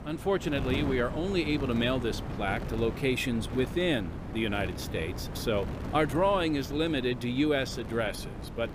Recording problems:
wind noise on the microphone; occasional gusts; 10 dB below the speech

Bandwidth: 15 kHz